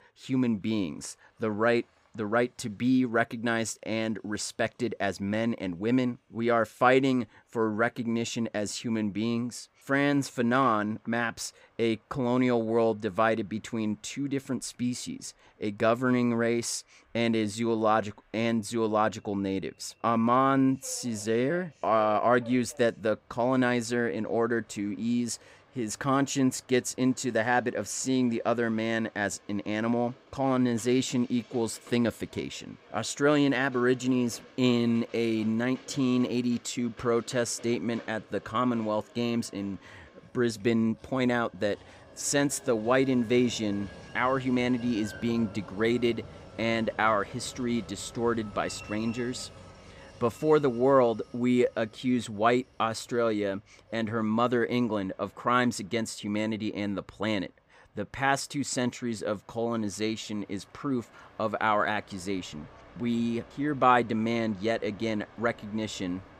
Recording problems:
train or aircraft noise; faint; throughout; 25 dB below the speech

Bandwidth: 15.5 kHz